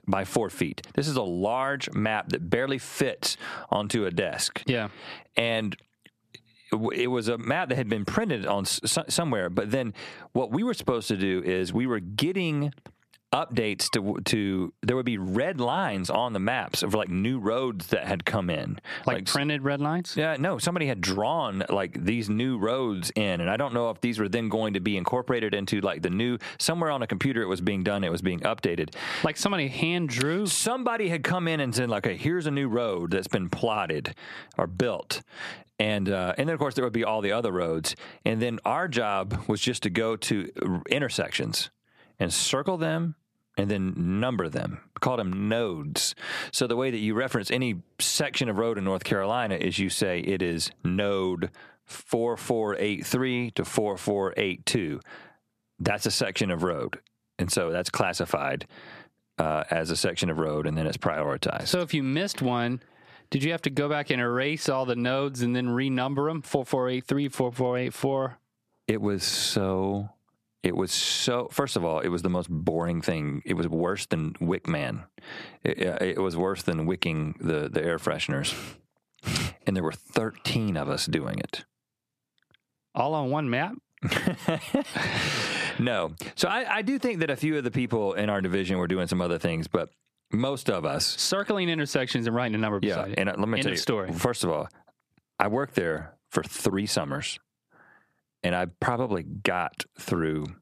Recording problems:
squashed, flat; somewhat

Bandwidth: 14.5 kHz